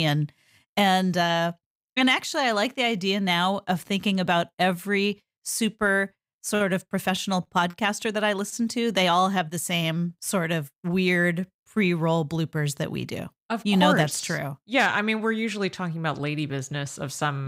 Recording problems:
abrupt cut into speech; at the start and the end

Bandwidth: 15.5 kHz